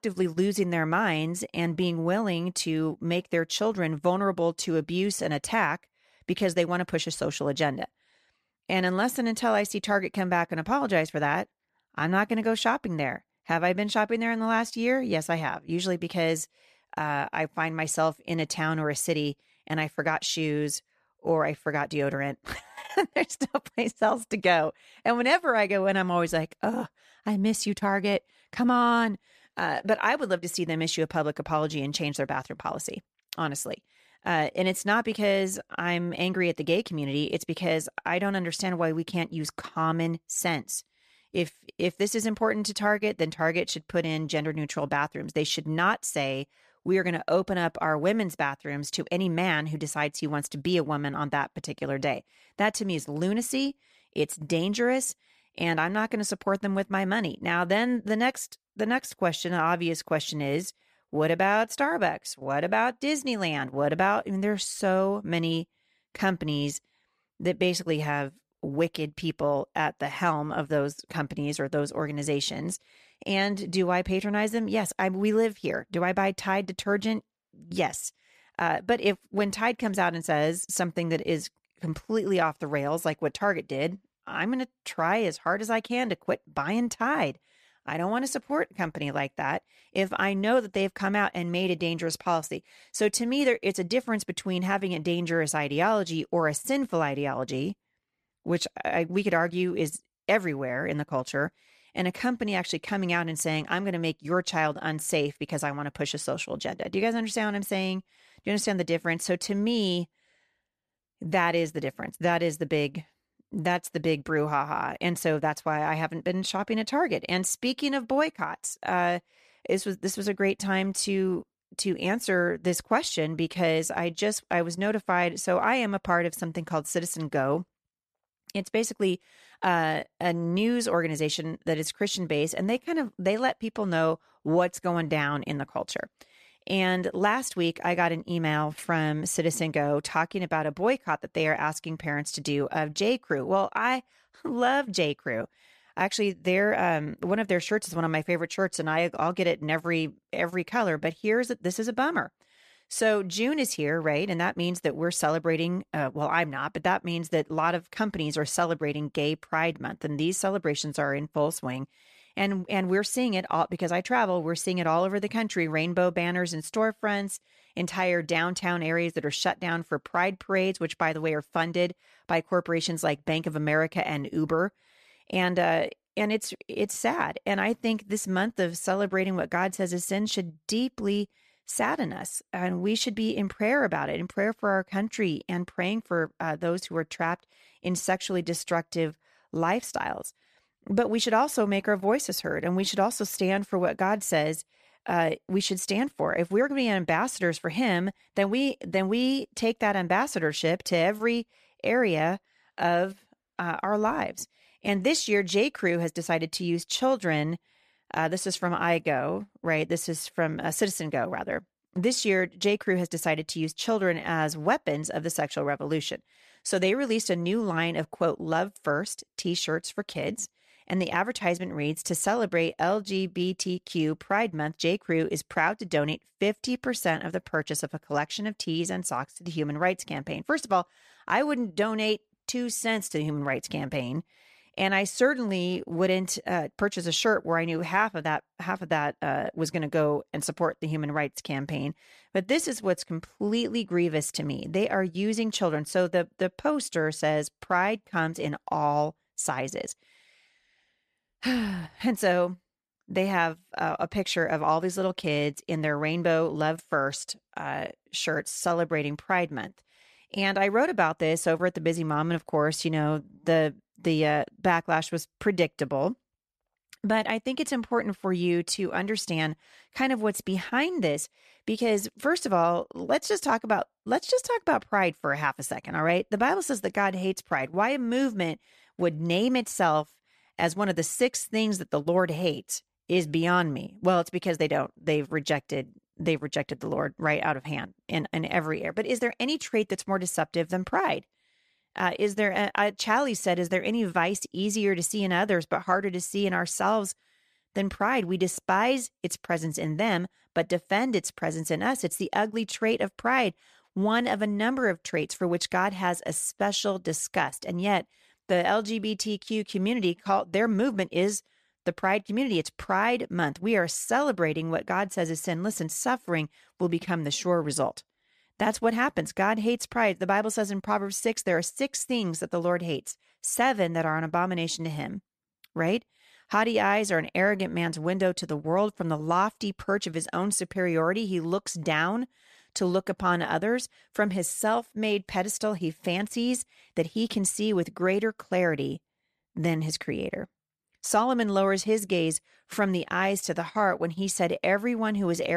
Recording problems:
abrupt cut into speech; at the end

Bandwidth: 14.5 kHz